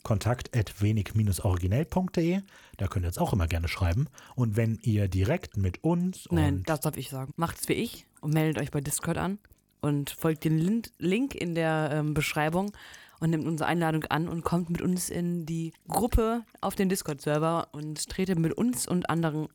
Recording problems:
electrical hum; faint; throughout; 50 Hz, 30 dB below the speech

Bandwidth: 18.5 kHz